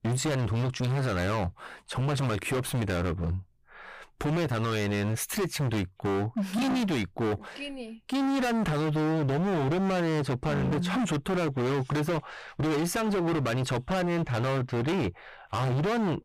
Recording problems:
distortion; heavy; 36% of the sound clipped

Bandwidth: 15 kHz